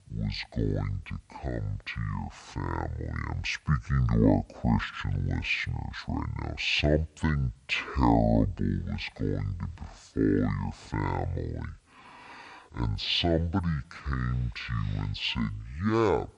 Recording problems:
wrong speed and pitch; too slow and too low; 0.5 times normal speed

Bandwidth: 10.5 kHz